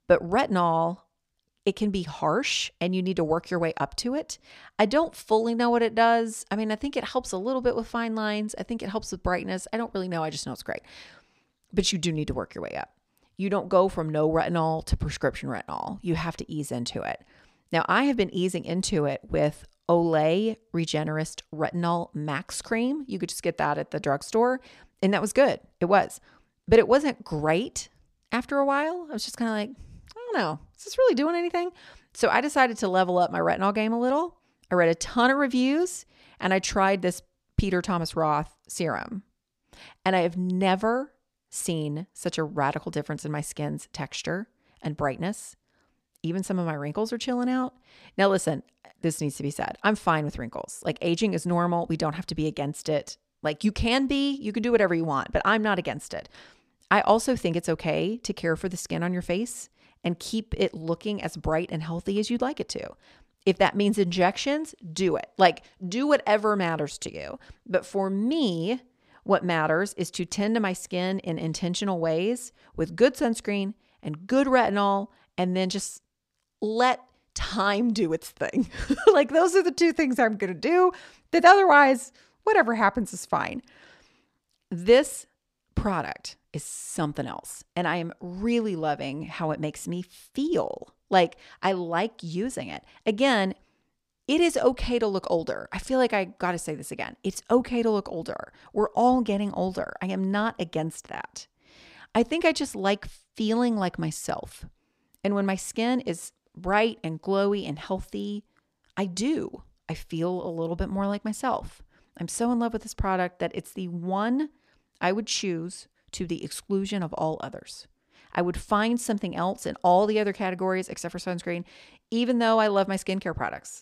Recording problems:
none

